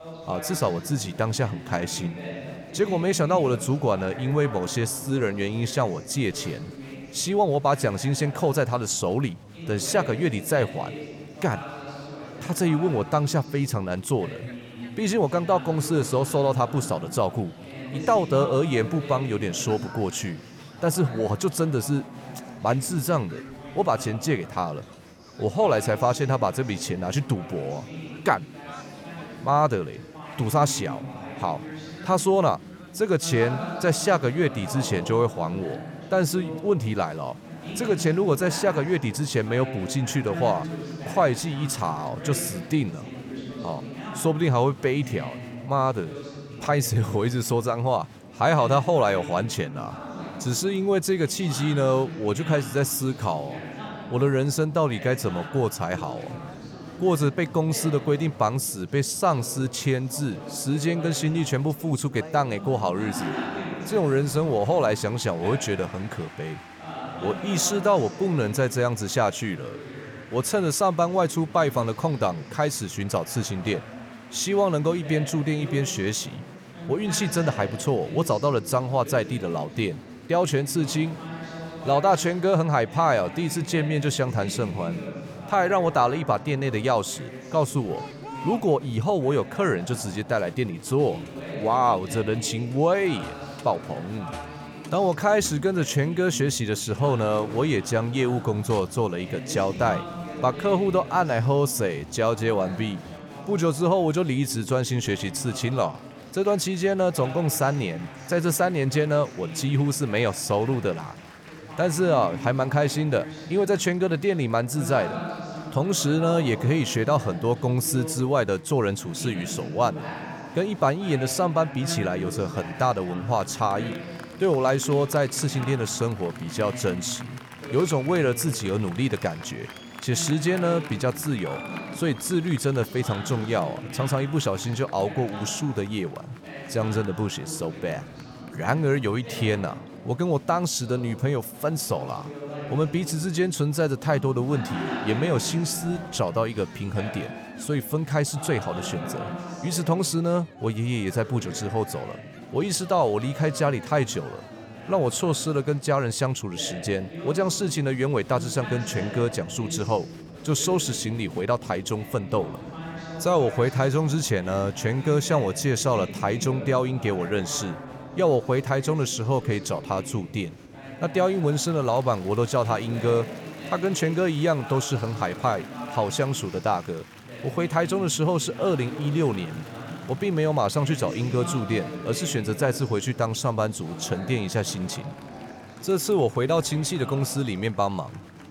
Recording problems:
chatter from many people; noticeable; throughout; 10 dB below the speech

